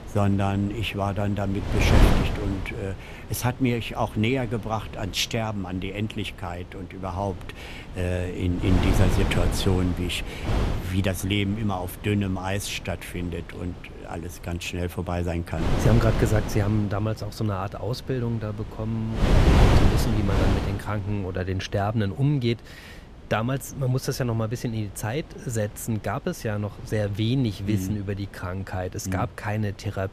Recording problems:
wind noise on the microphone; heavy; 1 dB below the speech

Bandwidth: 14.5 kHz